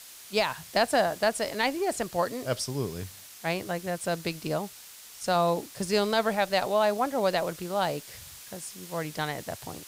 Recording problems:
hiss; noticeable; throughout; 15 dB below the speech

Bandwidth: 15.5 kHz